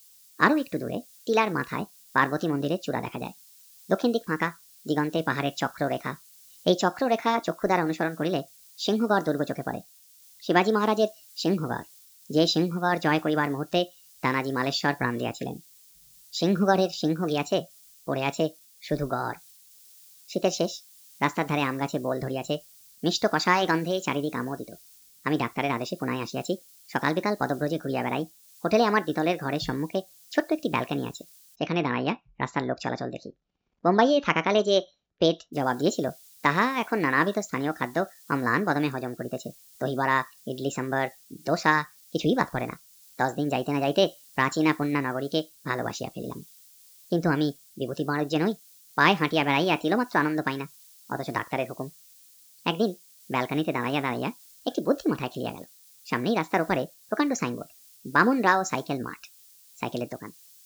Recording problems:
wrong speed and pitch; too fast and too high; 1.5 times normal speed
high frequencies cut off; noticeable; nothing above 8 kHz
hiss; faint; until 32 s and from 36 s on; 25 dB below the speech

